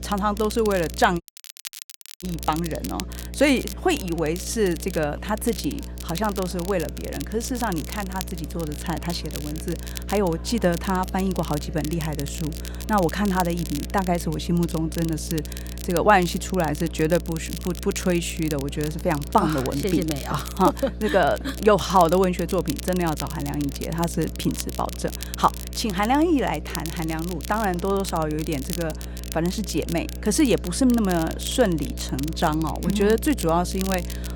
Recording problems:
crackle, like an old record; noticeable; 15 dB below the speech
electrical hum; faint; throughout; 60 Hz, 20 dB below the speech
murmuring crowd; faint; throughout; 25 dB below the speech
audio cutting out; at 1 s for 1 s

